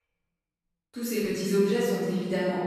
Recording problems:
room echo; strong; dies away in 2.4 s
off-mic speech; far

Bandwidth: 13.5 kHz